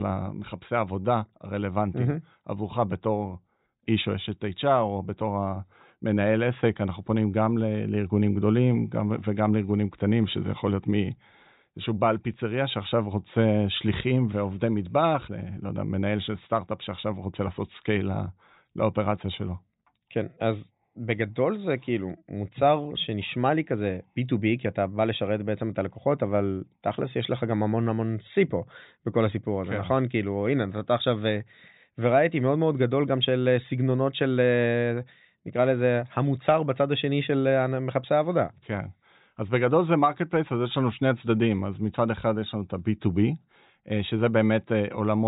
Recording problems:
high frequencies cut off; severe; nothing above 4 kHz
abrupt cut into speech; at the start and the end

